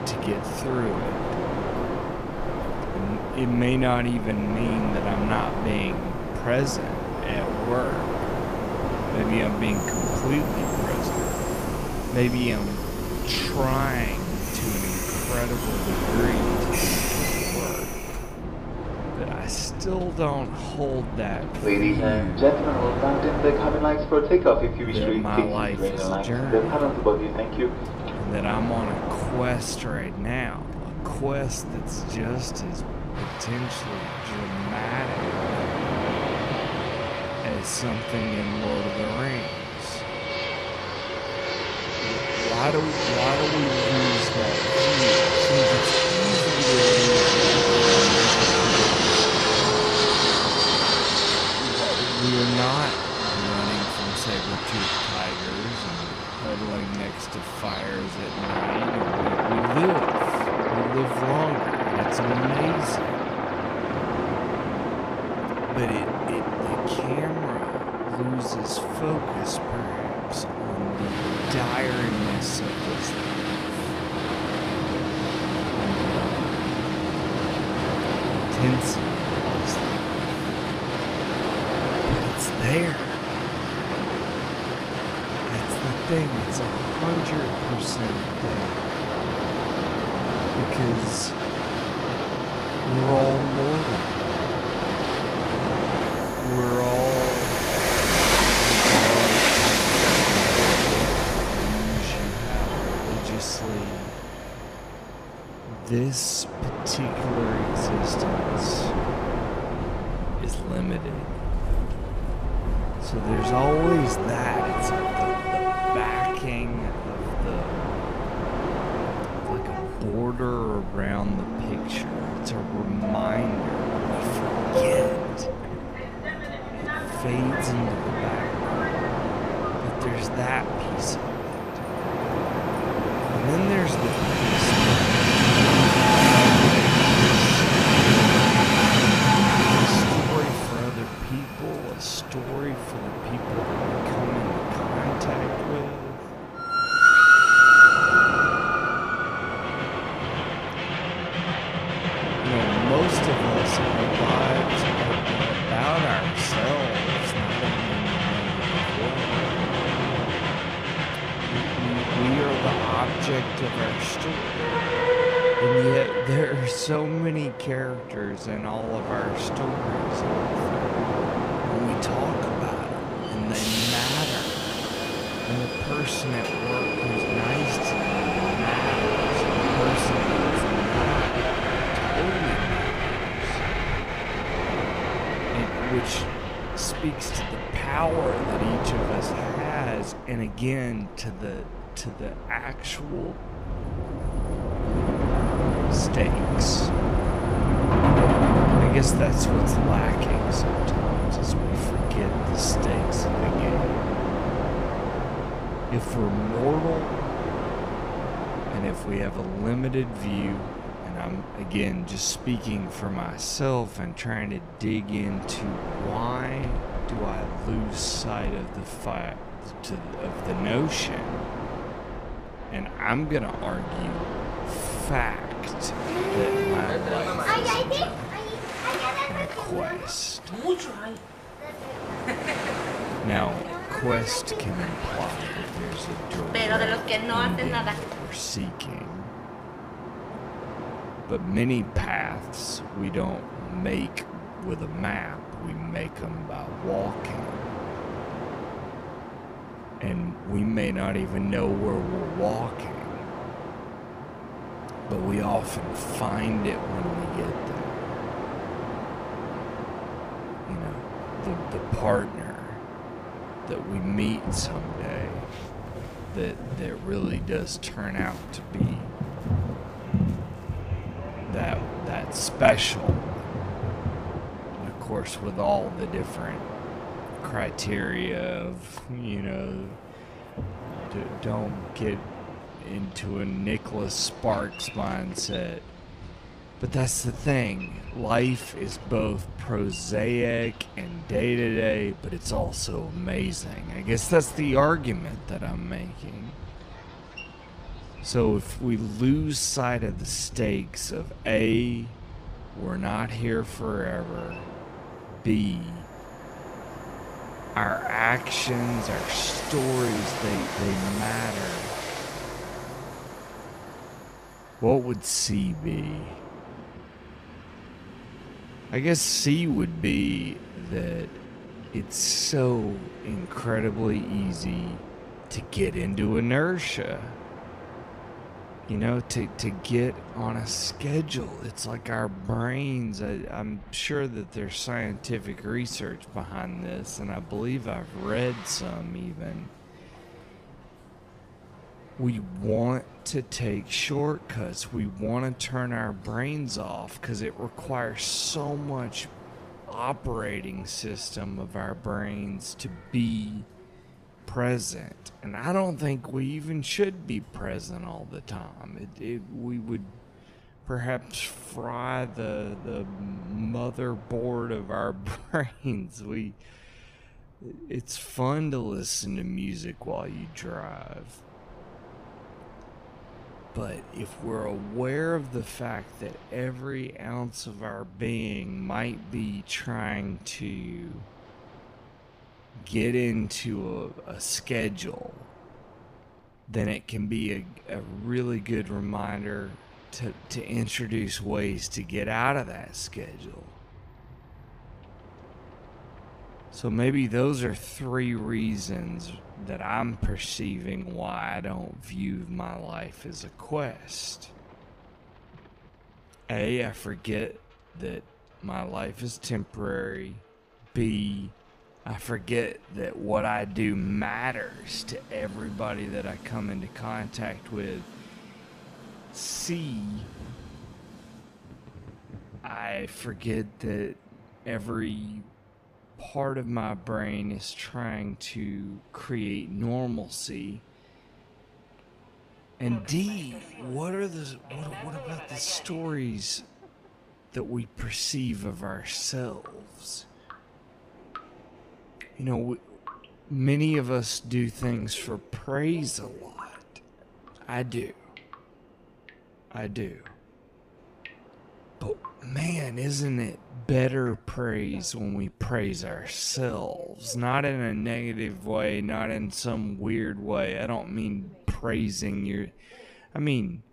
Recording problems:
wrong speed, natural pitch; too slow; 0.6 times normal speed
train or aircraft noise; very loud; throughout; 5 dB above the speech
rain or running water; faint; throughout; 25 dB below the speech

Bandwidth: 15 kHz